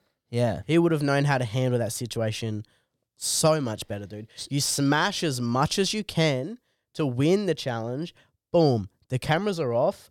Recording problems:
none

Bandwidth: 17.5 kHz